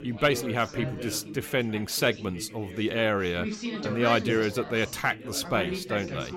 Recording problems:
background chatter; loud; throughout; 4 voices, 9 dB below the speech

